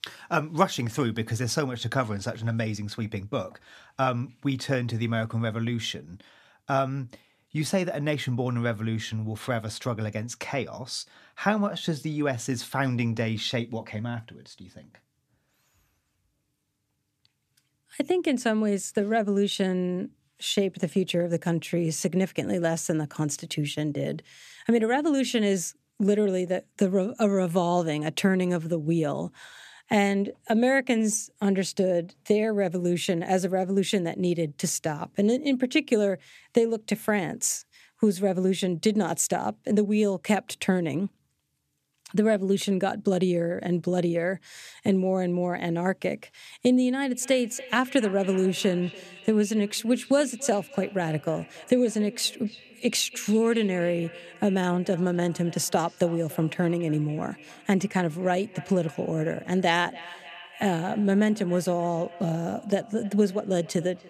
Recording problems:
echo of what is said; faint; from 47 s on; 290 ms later, 20 dB below the speech

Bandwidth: 14.5 kHz